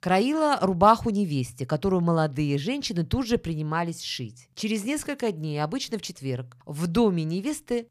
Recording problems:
none

